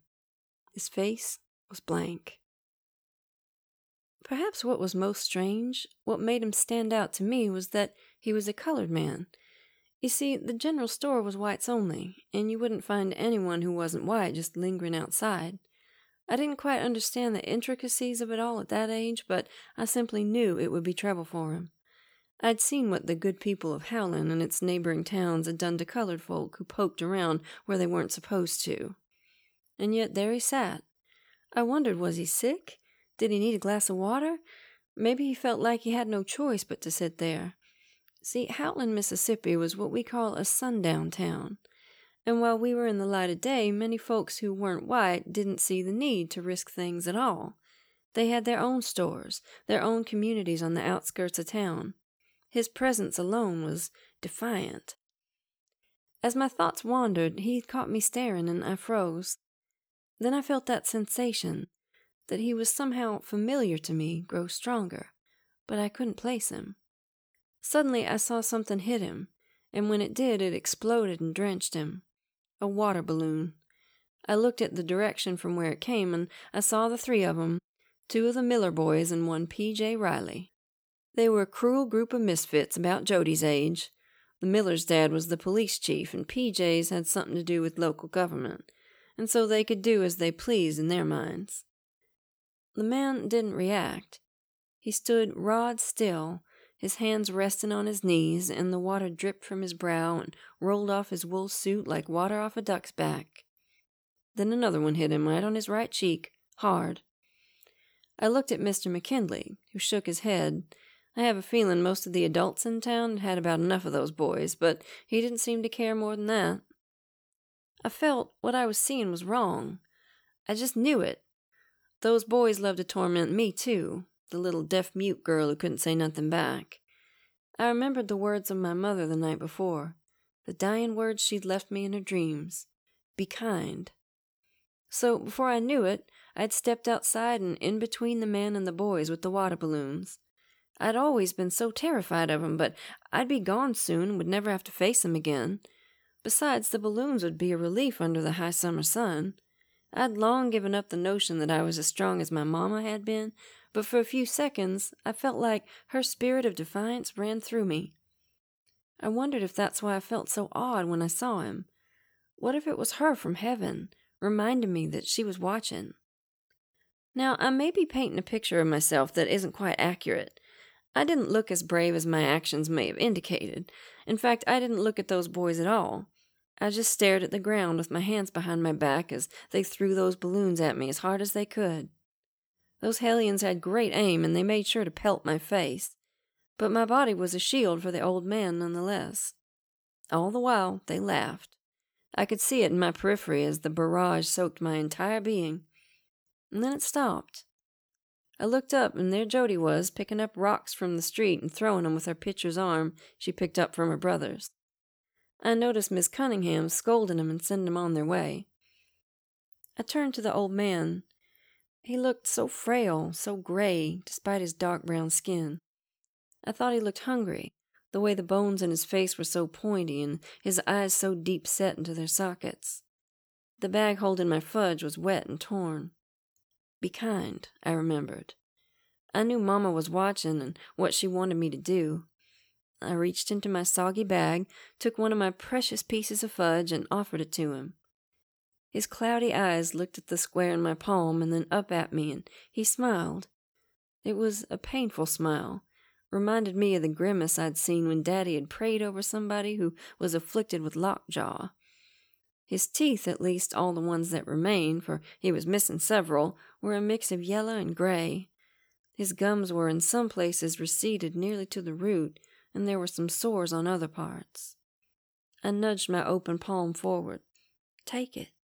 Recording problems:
none

